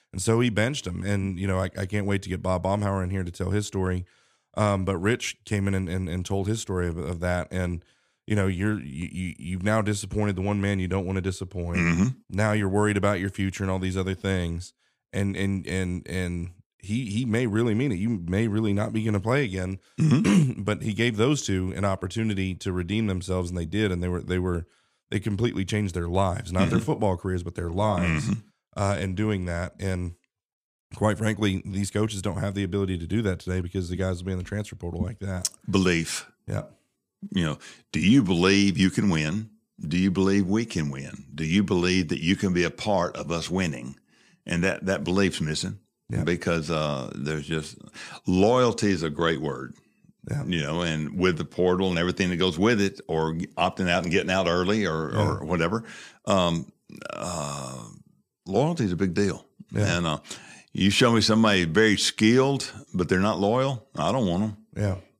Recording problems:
none

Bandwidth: 15 kHz